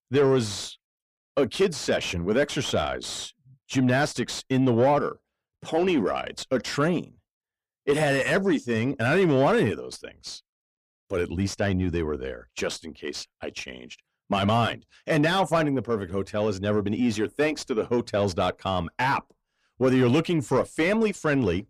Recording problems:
distortion; slight; 10 dB below the speech

